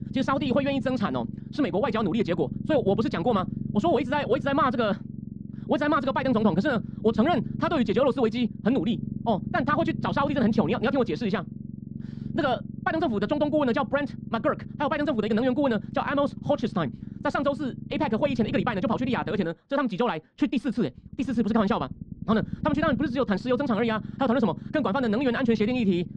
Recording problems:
wrong speed, natural pitch; too fast; 1.6 times normal speed
muffled; slightly; fading above 2 kHz
low rumble; noticeable; throughout; 15 dB below the speech

